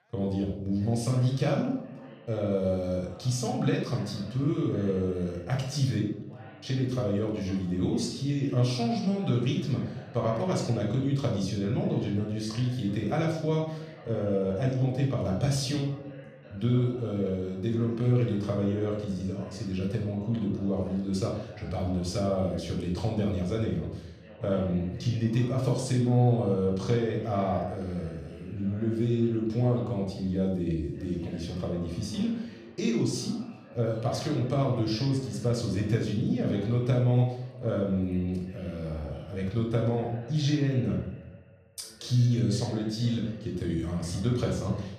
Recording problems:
off-mic speech; far
room echo; noticeable; dies away in 0.7 s
background chatter; faint; throughout; 2 voices, 20 dB below the speech

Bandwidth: 14.5 kHz